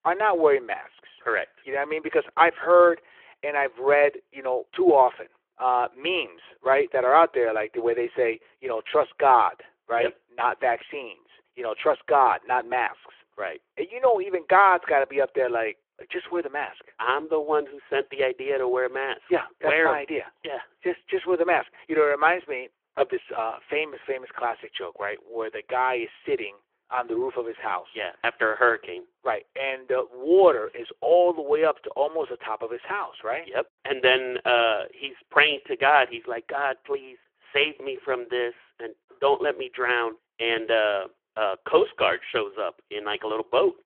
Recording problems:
phone-call audio

